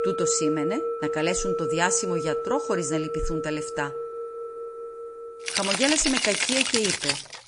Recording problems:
garbled, watery; slightly; nothing above 8.5 kHz
background music; loud; throughout; as loud as the speech

